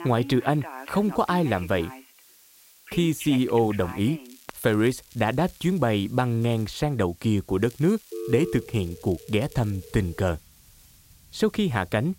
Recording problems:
alarms or sirens; noticeable; throughout; 15 dB below the speech
hiss; faint; throughout; 25 dB below the speech
crackling; faint; from 4.5 to 6 s, at 6.5 s and from 7.5 to 10 s; 25 dB below the speech

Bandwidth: 16 kHz